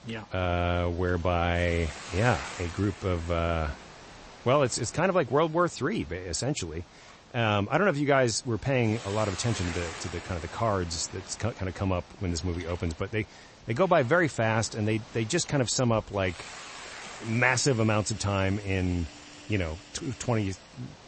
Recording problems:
garbled, watery; slightly; nothing above 8 kHz
hiss; noticeable; throughout; 15 dB below the speech
machinery noise; faint; throughout; 25 dB below the speech

